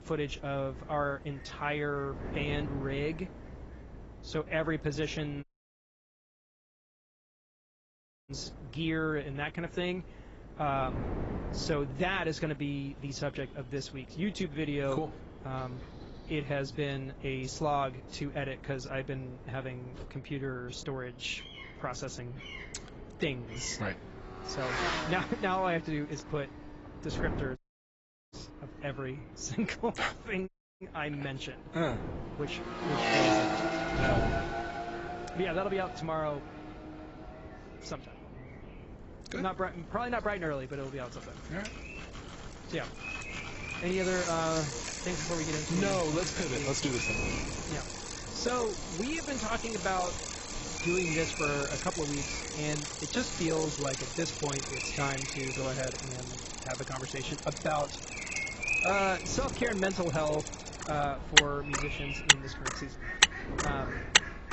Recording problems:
garbled, watery; badly; nothing above 7.5 kHz
traffic noise; very loud; throughout; 1 dB above the speech
animal sounds; loud; throughout; 6 dB below the speech
wind noise on the microphone; occasional gusts; 15 dB below the speech
audio cutting out; at 5.5 s for 3 s, at 28 s for 1 s and at 30 s

